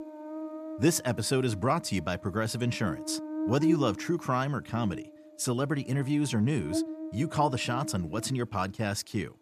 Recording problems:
electrical hum; loud; throughout; 60 Hz, 8 dB below the speech

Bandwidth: 14.5 kHz